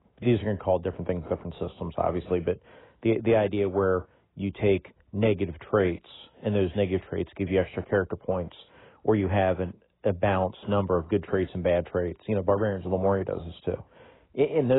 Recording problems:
garbled, watery; badly; nothing above 3.5 kHz
abrupt cut into speech; at the end

